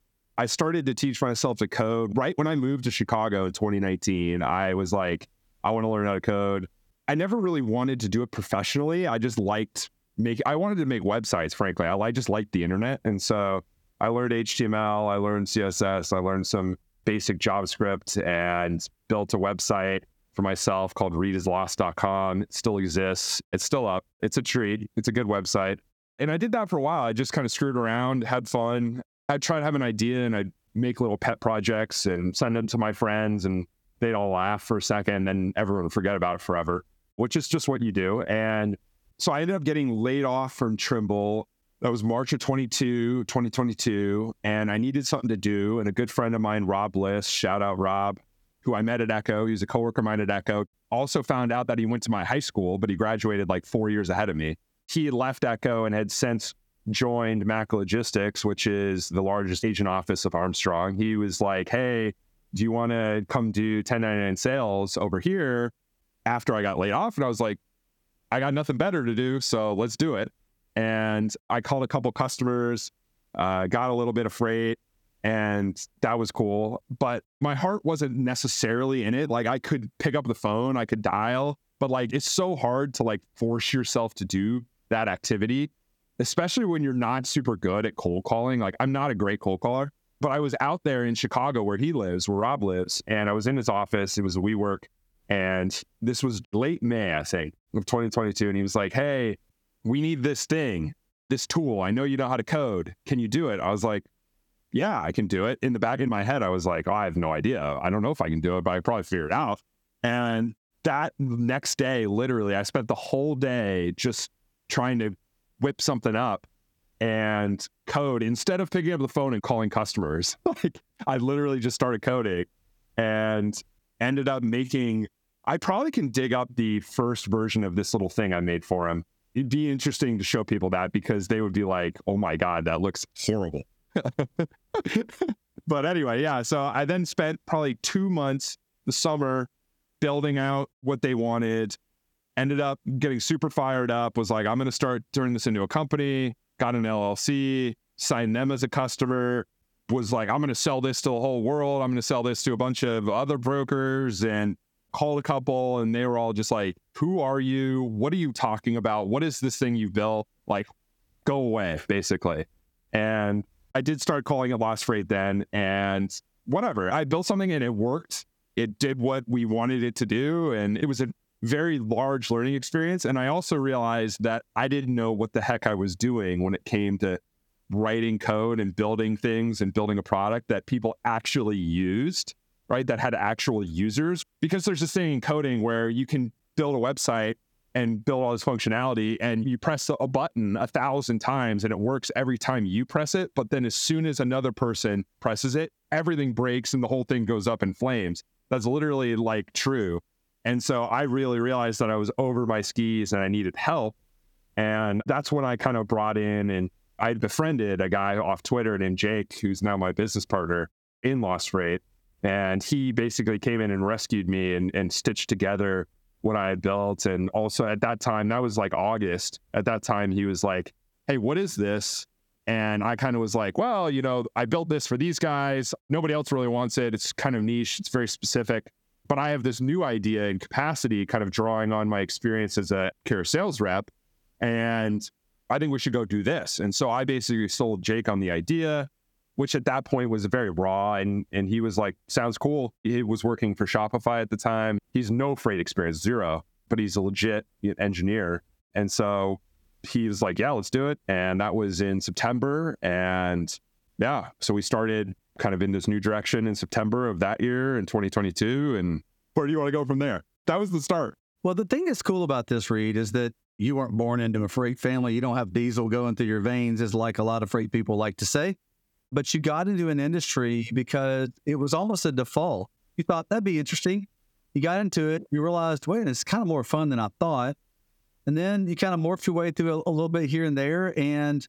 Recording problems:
squashed, flat; somewhat

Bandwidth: 18.5 kHz